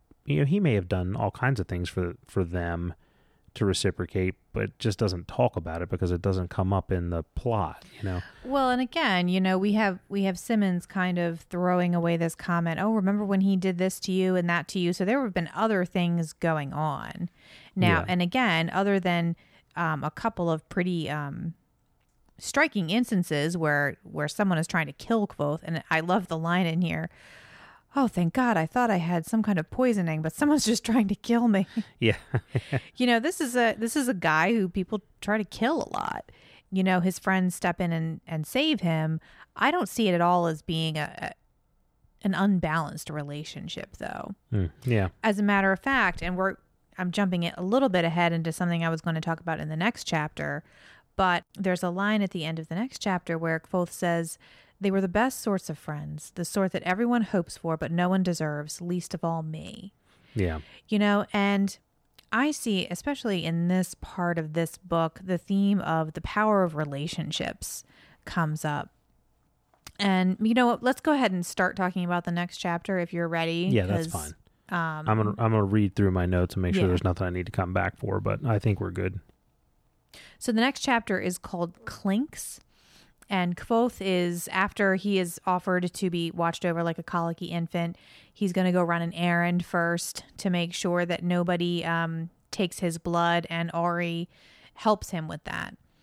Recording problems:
none

